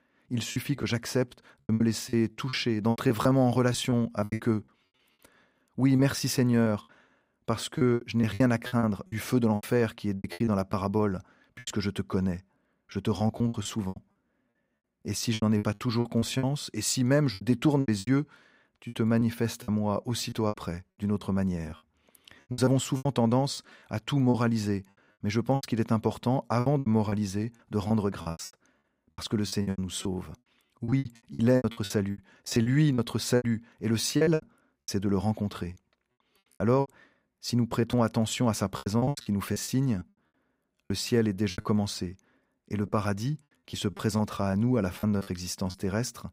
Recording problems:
choppy; very; 15% of the speech affected

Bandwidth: 15.5 kHz